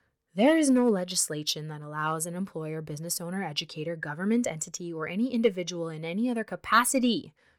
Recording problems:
none

